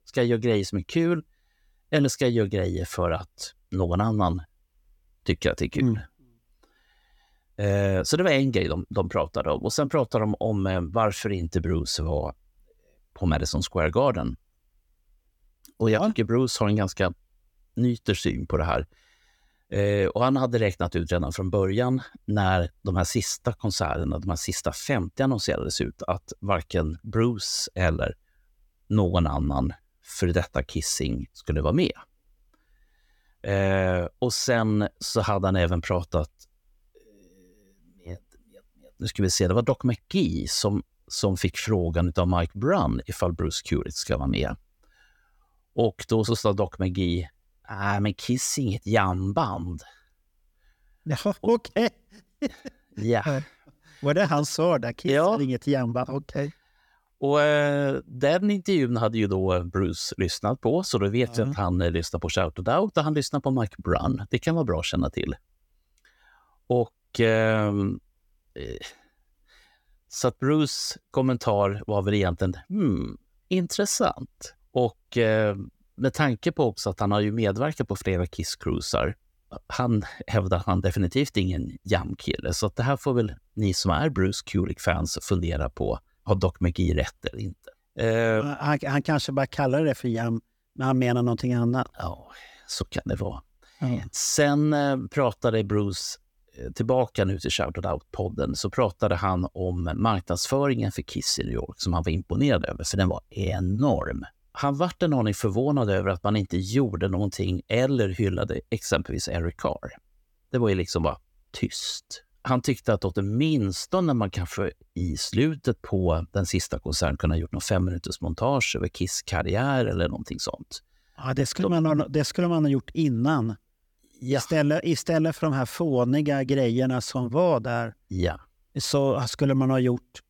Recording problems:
none

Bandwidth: 18 kHz